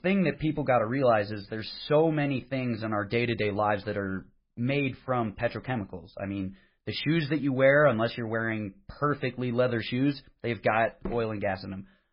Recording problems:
garbled, watery; badly; nothing above 5 kHz

